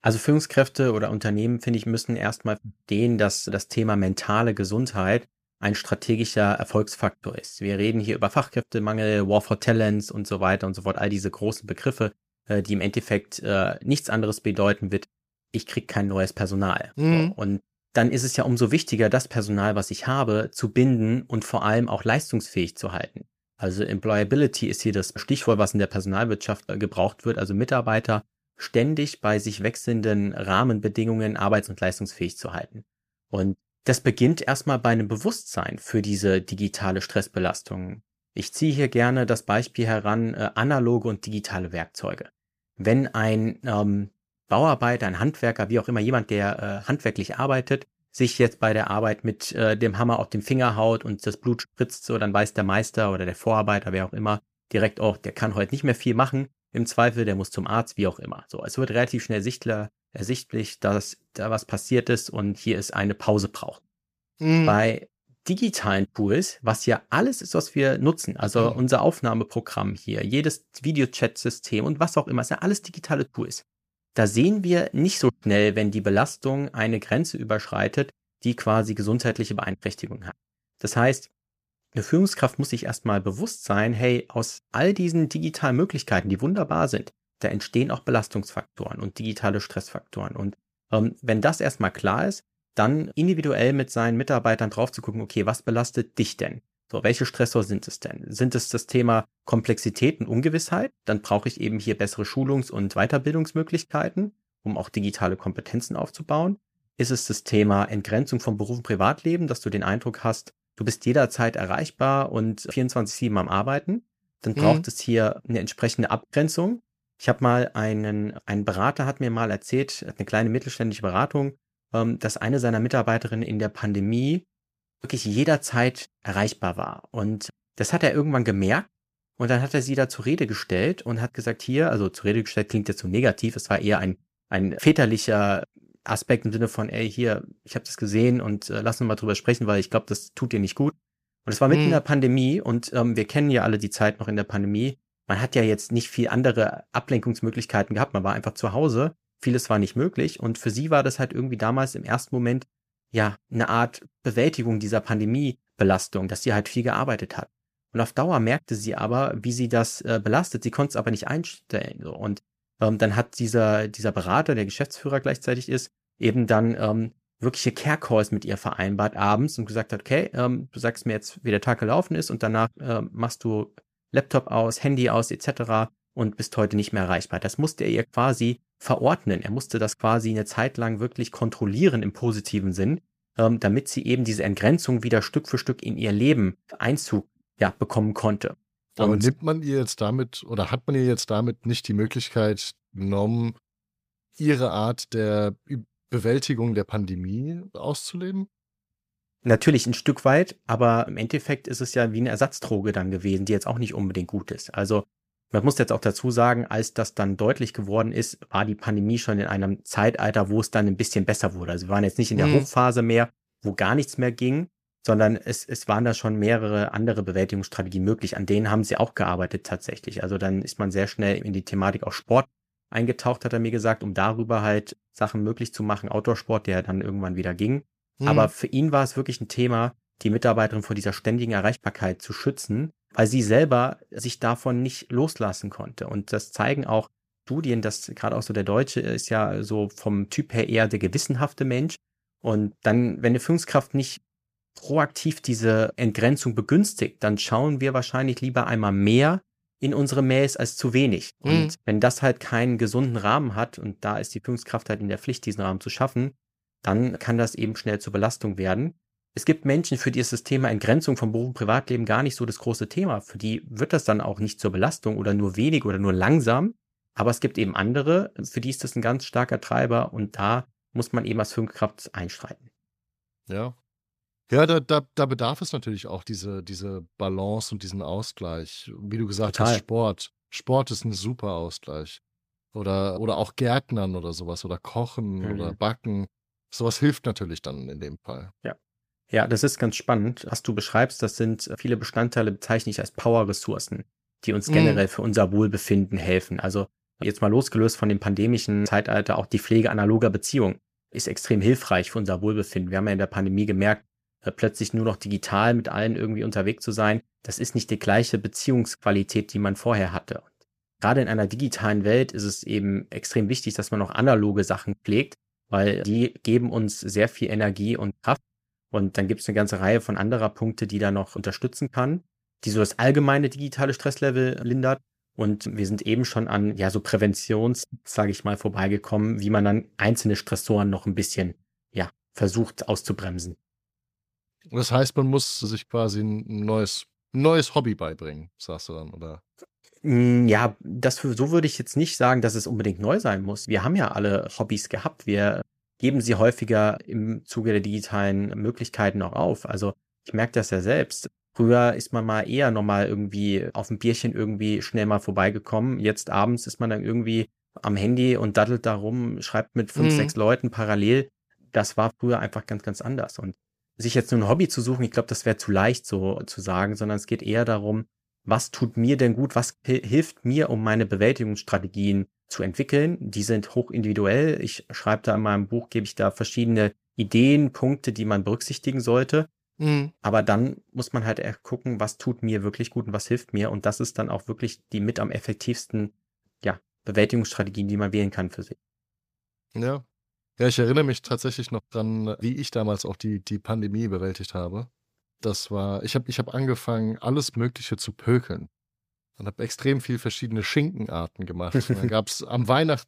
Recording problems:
none

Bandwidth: 15 kHz